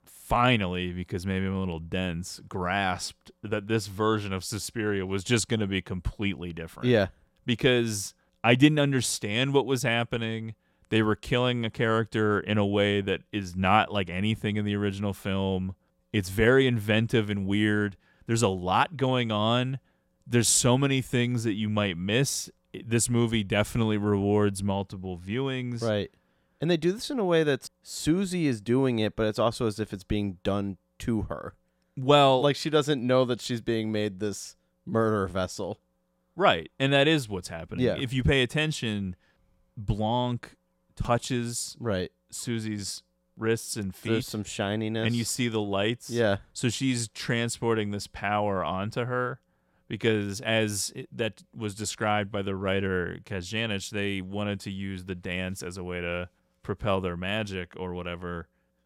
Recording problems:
none

